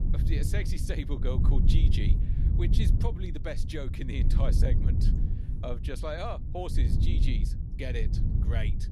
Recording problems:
low rumble; loud; throughout; 5 dB below the speech

